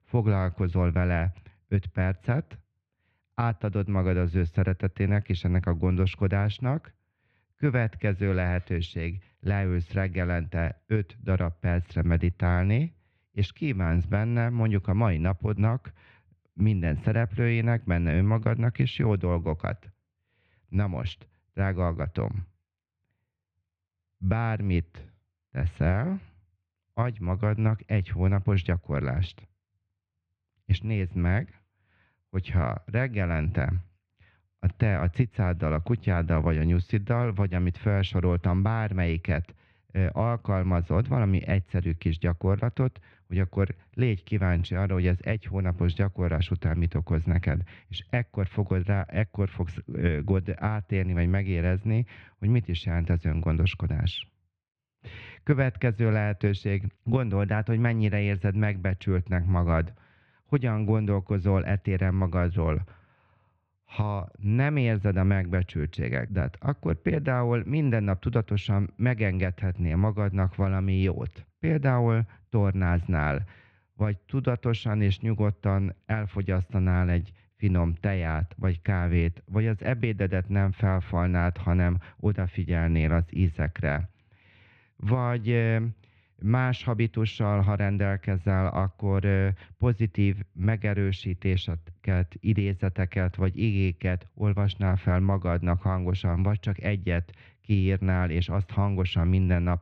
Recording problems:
muffled; very; fading above 2.5 kHz

